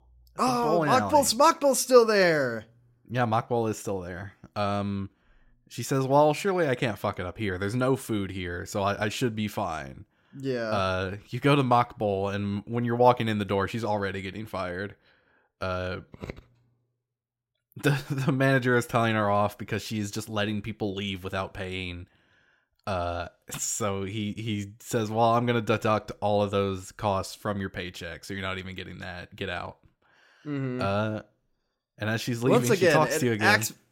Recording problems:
none

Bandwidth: 16 kHz